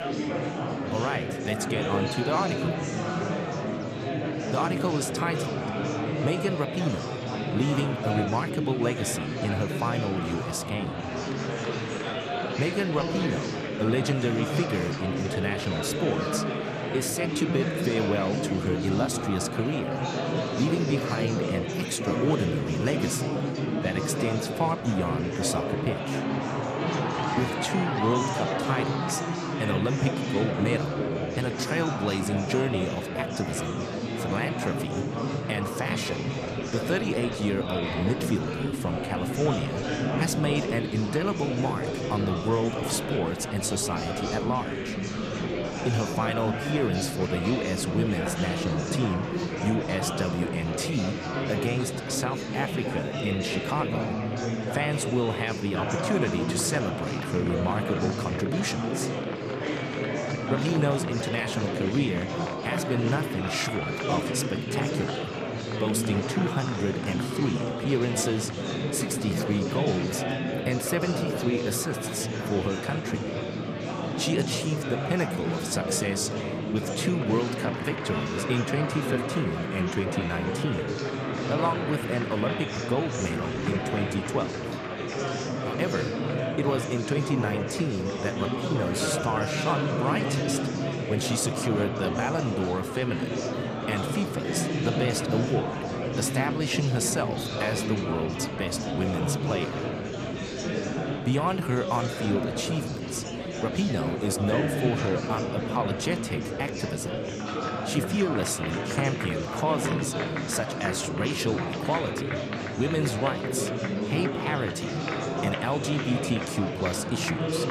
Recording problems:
murmuring crowd; loud; throughout; as loud as the speech

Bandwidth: 14.5 kHz